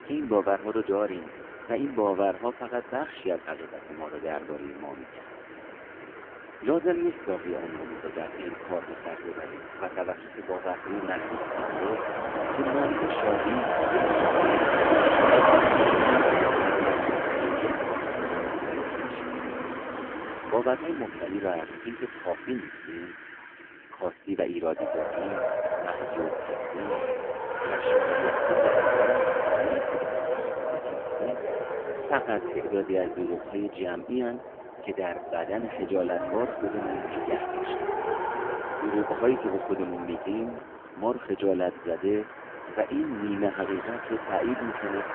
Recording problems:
phone-call audio; poor line
traffic noise; very loud; throughout; 4 dB above the speech

